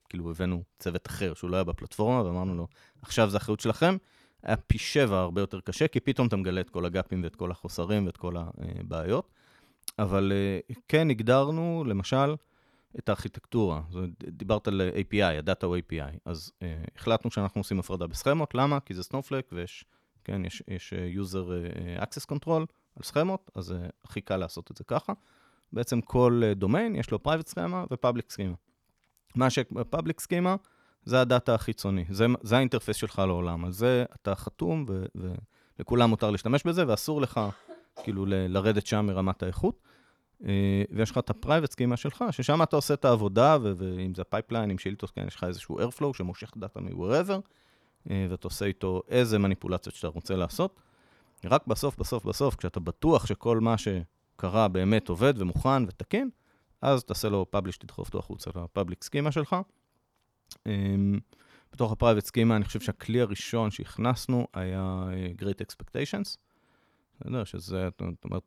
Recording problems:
none

